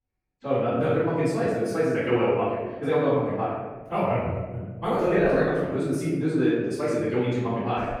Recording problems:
room echo; strong; dies away in 1.2 s
off-mic speech; far
wrong speed, natural pitch; too fast; 1.6 times normal speed

